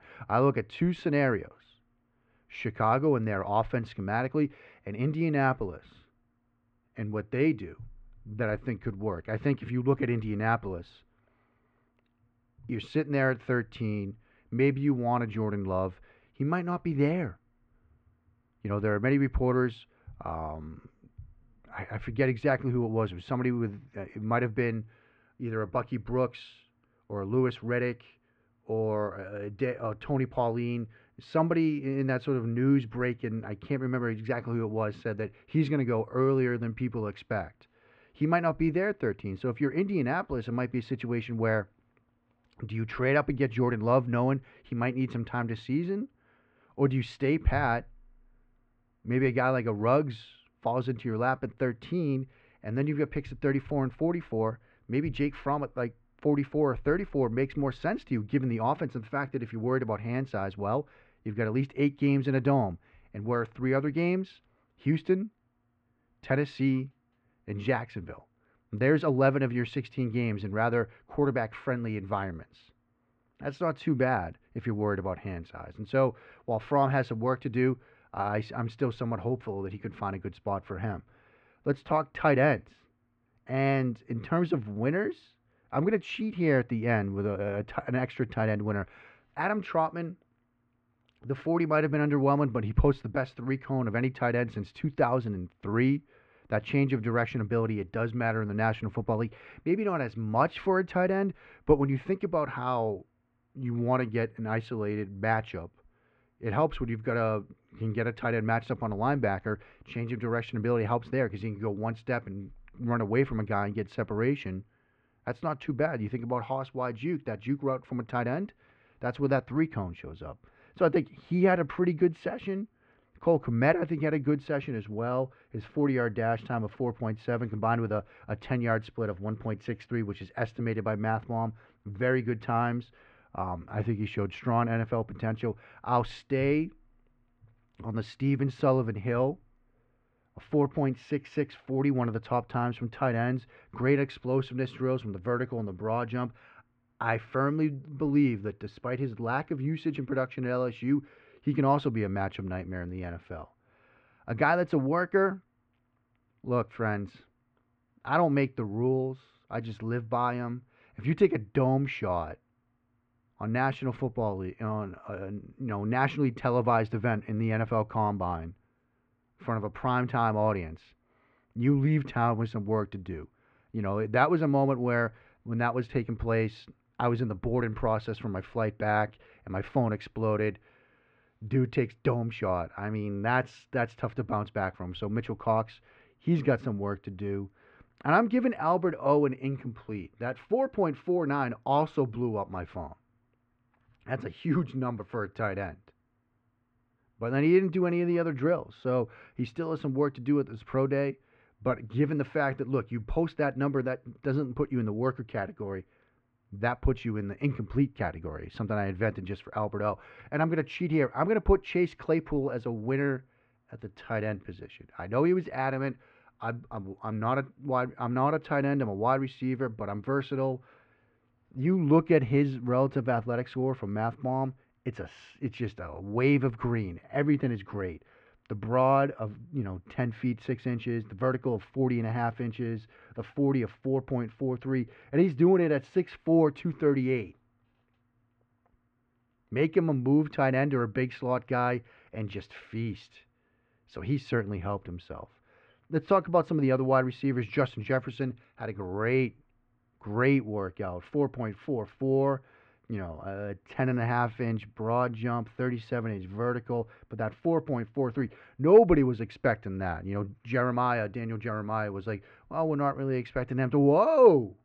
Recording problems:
muffled; very; fading above 2.5 kHz

